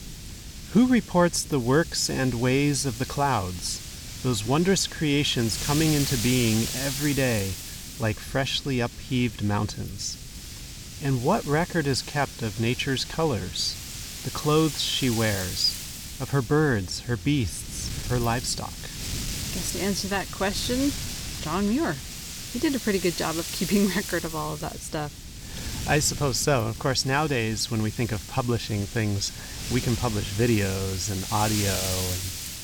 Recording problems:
wind noise on the microphone; heavy; 8 dB below the speech

